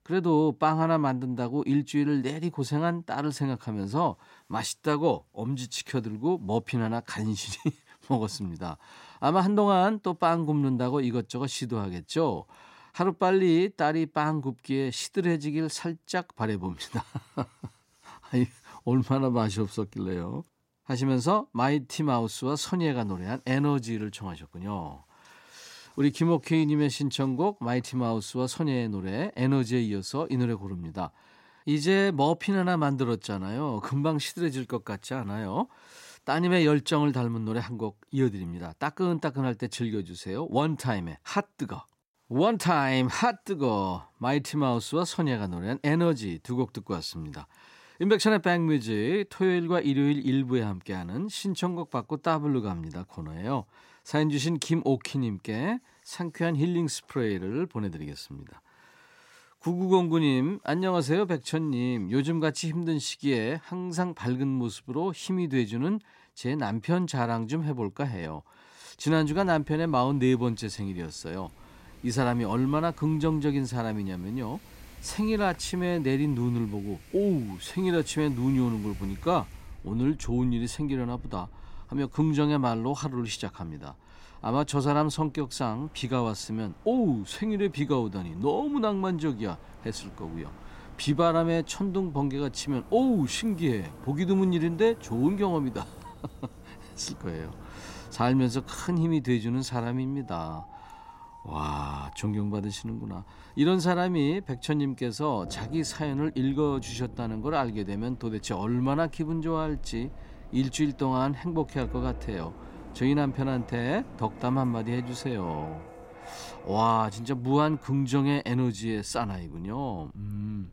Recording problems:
wind in the background; noticeable; from 1:09 on; 20 dB below the speech

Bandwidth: 16 kHz